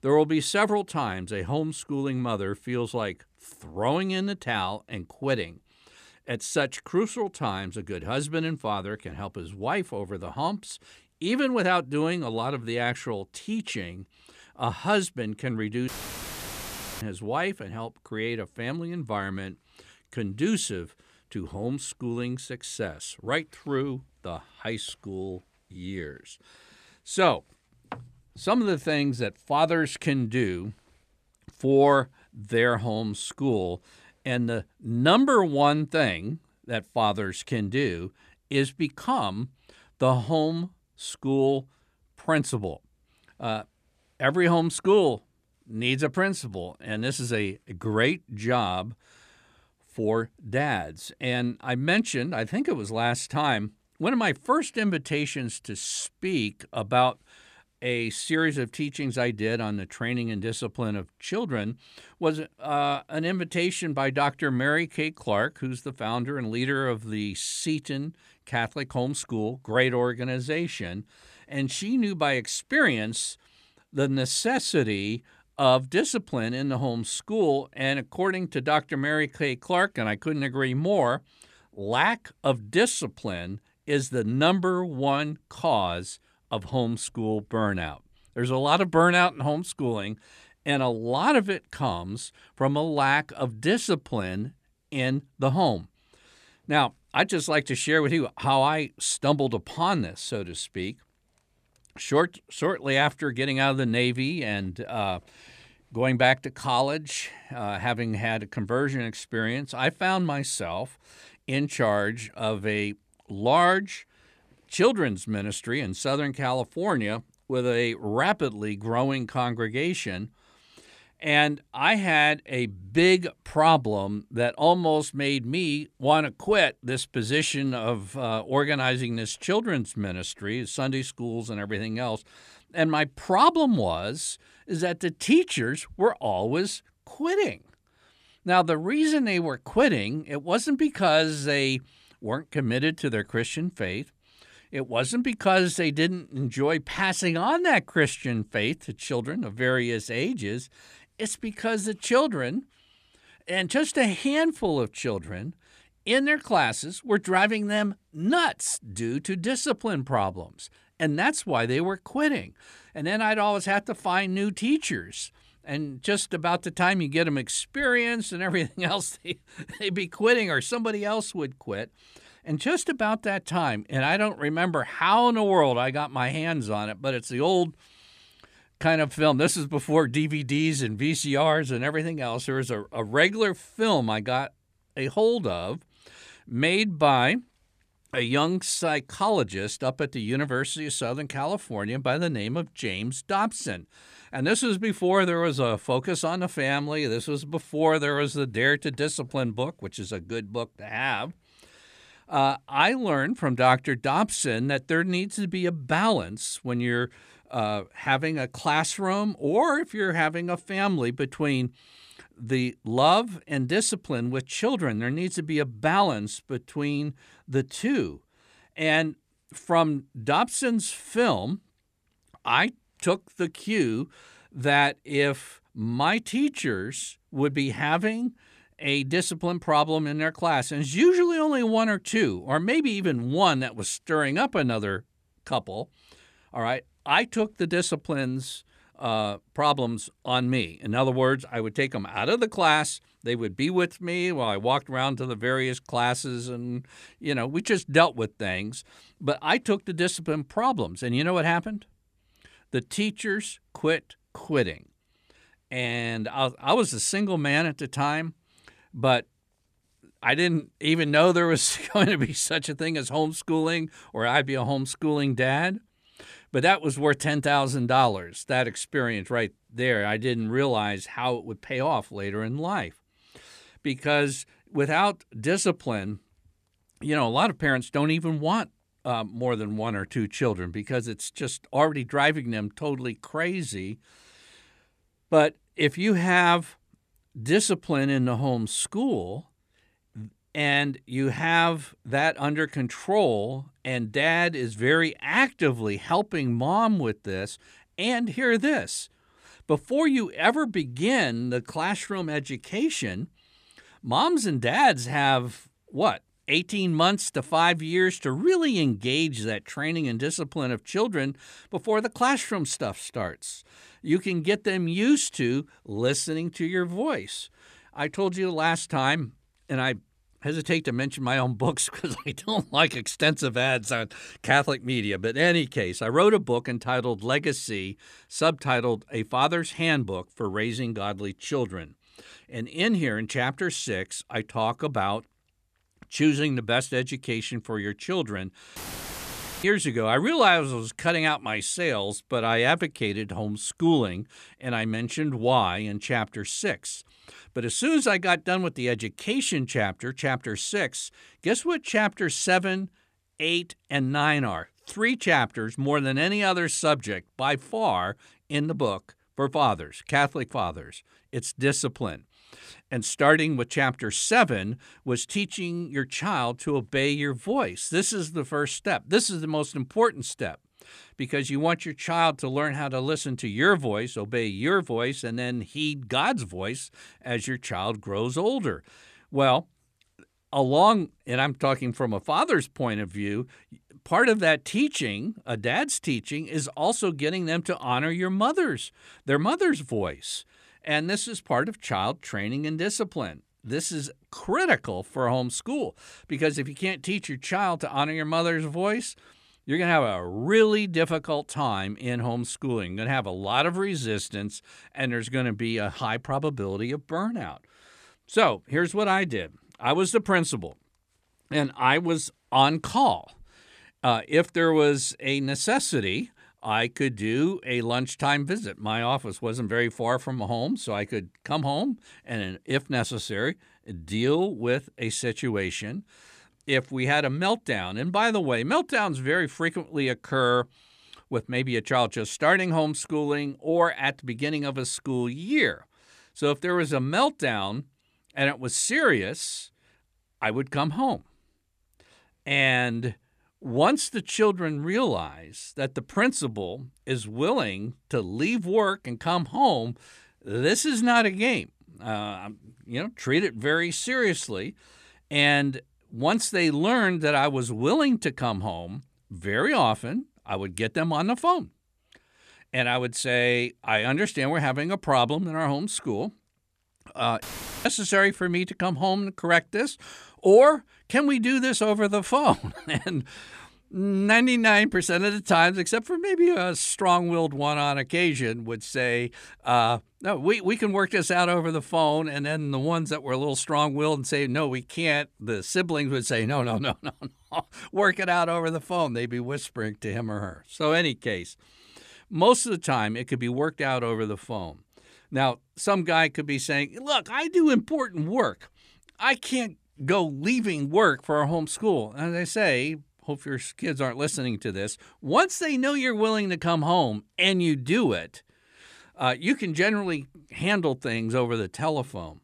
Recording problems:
audio cutting out; filled with static; at 16 s for 1 s, at 5:39 for 1 s and at 7:47

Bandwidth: 14.5 kHz